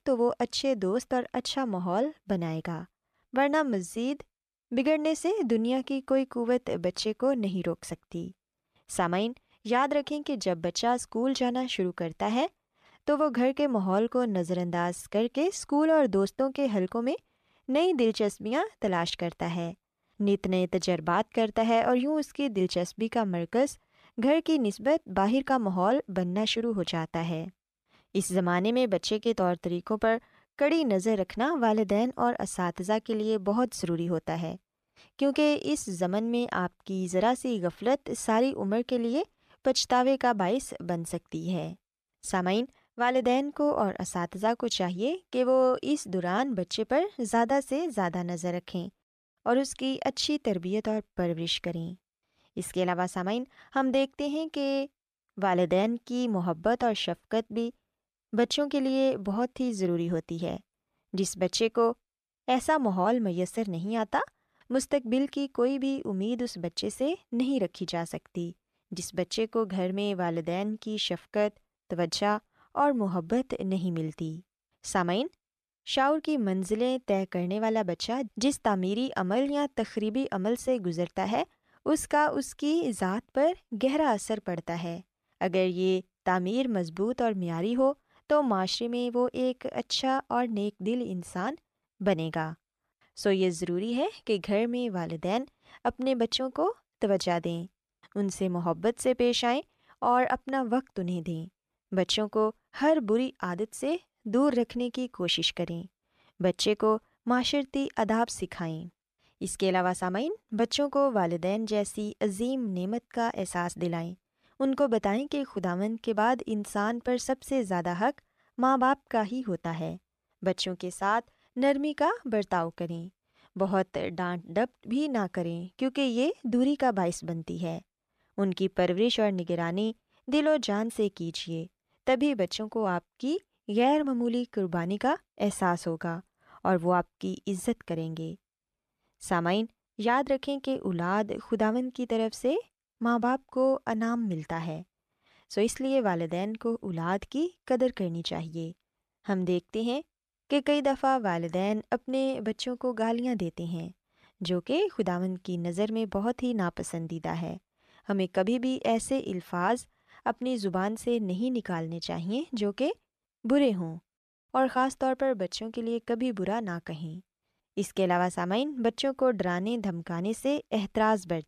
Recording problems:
none

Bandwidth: 14.5 kHz